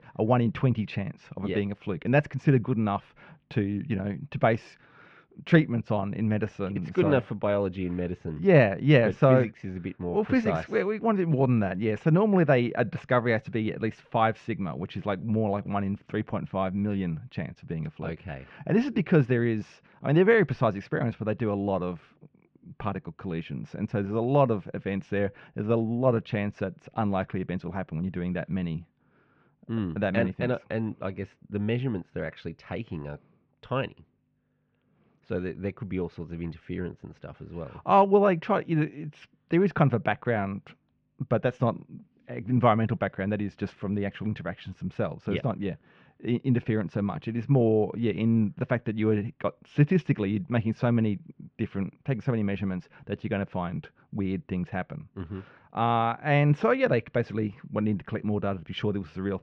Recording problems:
muffled; very; fading above 3 kHz

